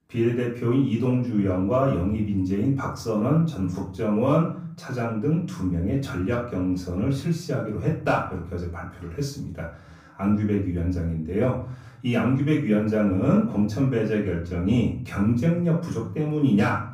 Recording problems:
off-mic speech; far
room echo; slight; dies away in 0.6 s

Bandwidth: 15.5 kHz